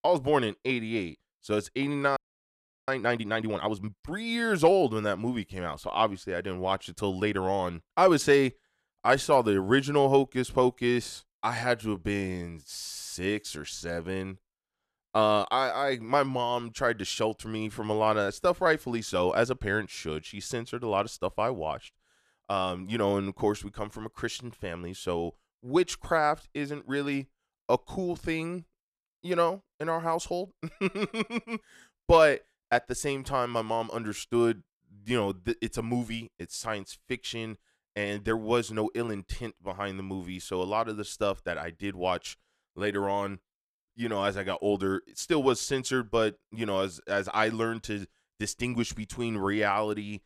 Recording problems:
audio freezing; at 2 s for 0.5 s

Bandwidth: 14.5 kHz